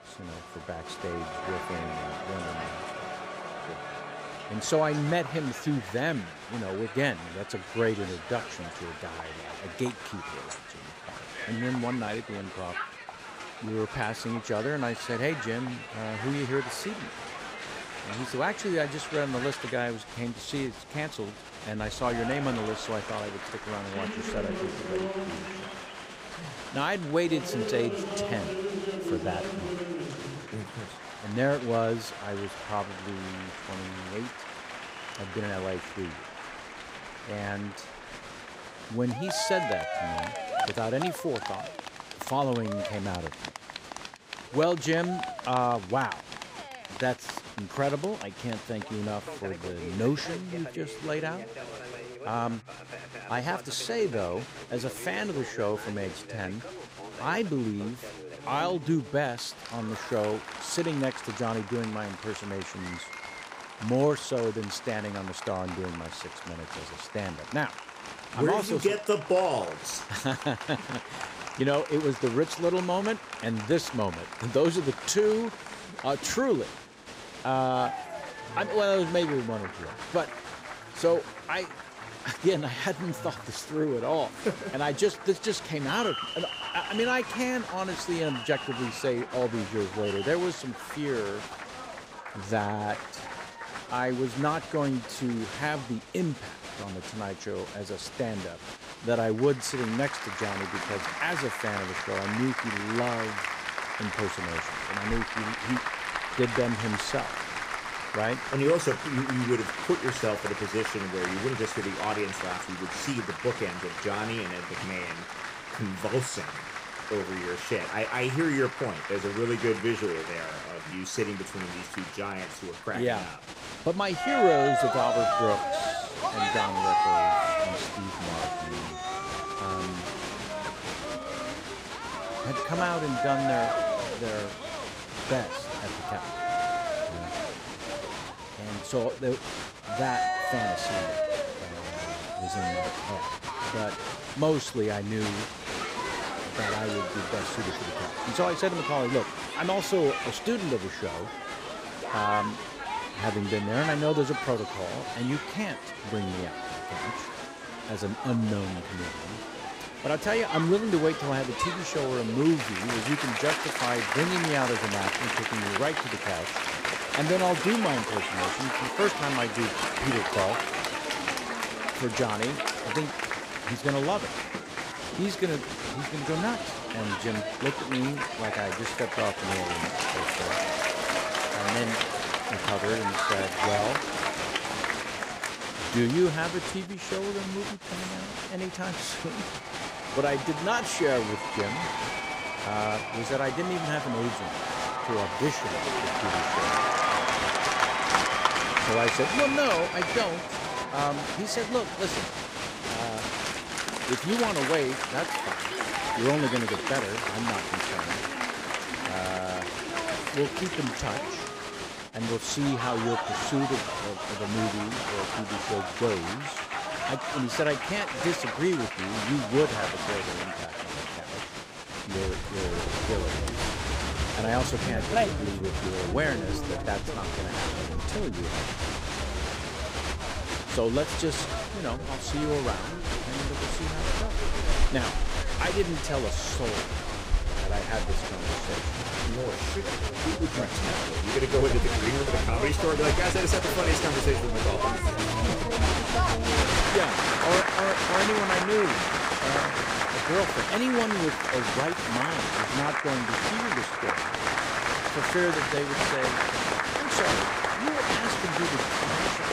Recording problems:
crowd noise; loud; throughout; 1 dB below the speech

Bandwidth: 15.5 kHz